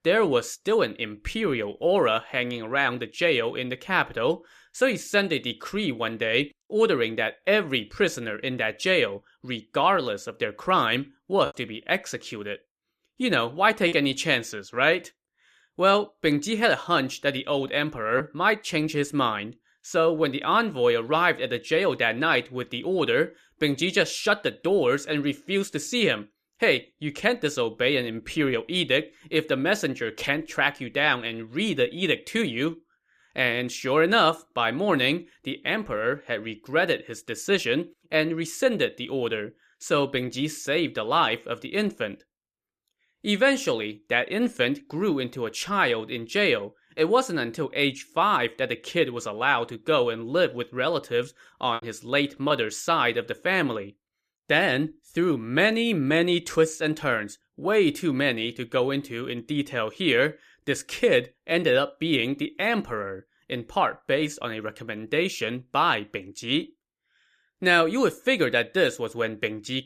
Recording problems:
choppy; occasionally; from 11 to 14 s and at 52 s; 3% of the speech affected

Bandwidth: 14.5 kHz